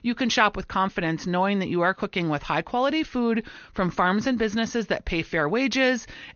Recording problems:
high frequencies cut off; noticeable; nothing above 6.5 kHz

